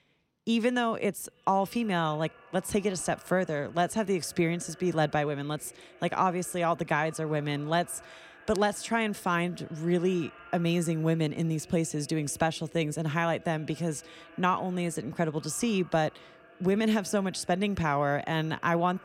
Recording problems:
echo of what is said; faint; throughout; 270 ms later, 25 dB below the speech

